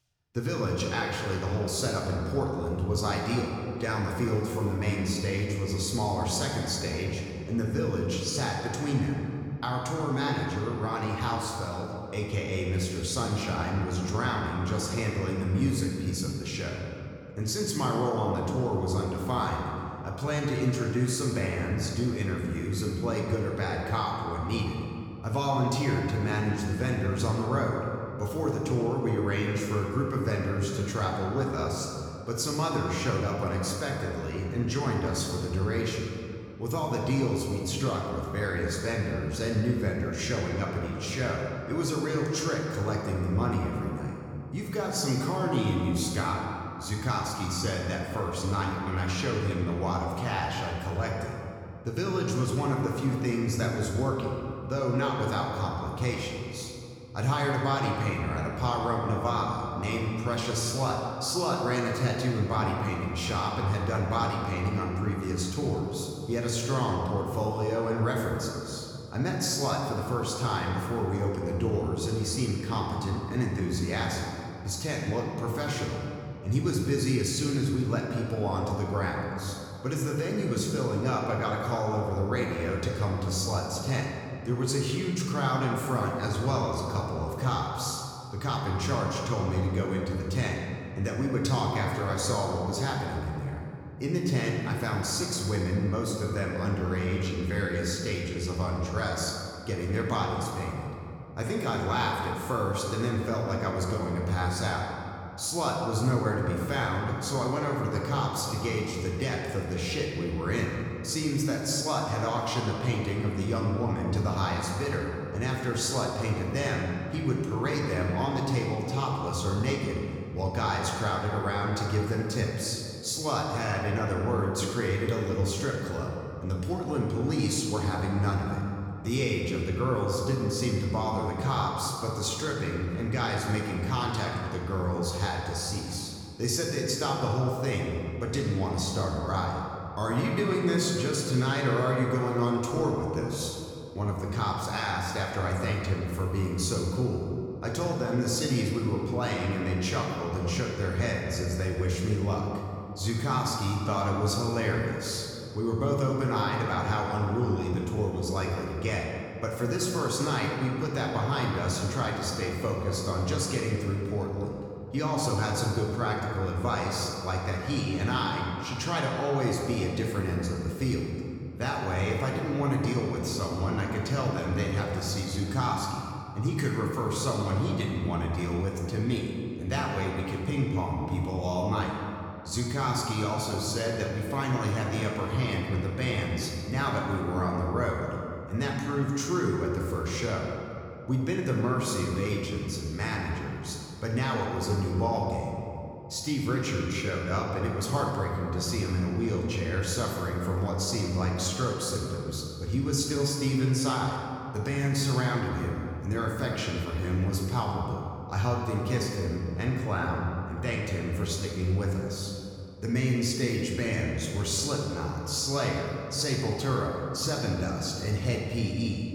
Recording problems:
room echo; noticeable; dies away in 2.3 s
off-mic speech; somewhat distant

